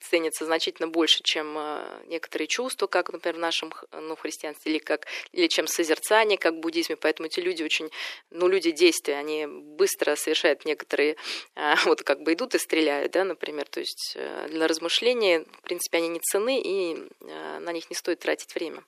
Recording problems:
thin; very; fading below 350 Hz

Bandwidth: 14.5 kHz